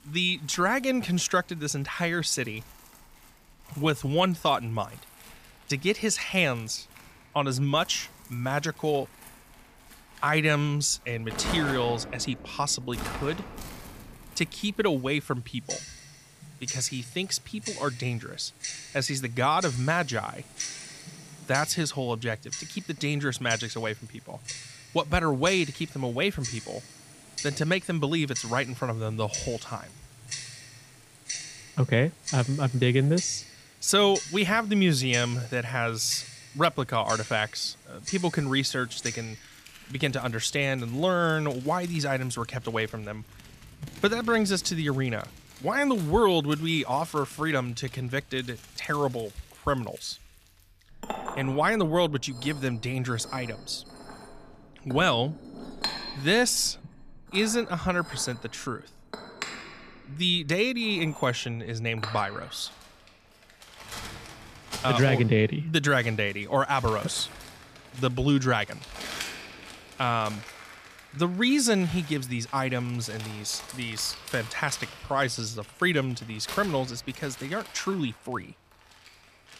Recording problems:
household noises; noticeable; throughout; 15 dB below the speech

